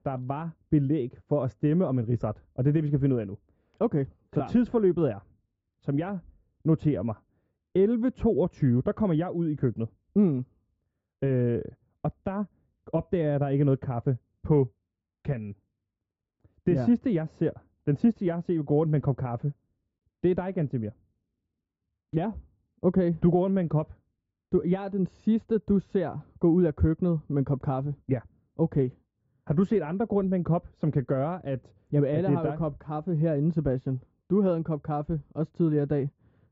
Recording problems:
high frequencies cut off; noticeable; nothing above 8 kHz
muffled; very slightly; fading above 1 kHz

